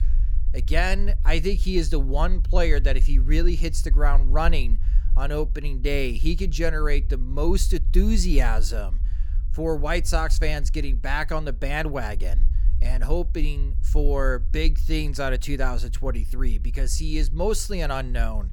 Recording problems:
low rumble; faint; throughout; 20 dB below the speech

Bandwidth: 18 kHz